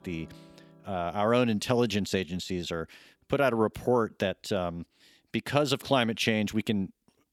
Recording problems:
background music; faint; throughout; 30 dB below the speech

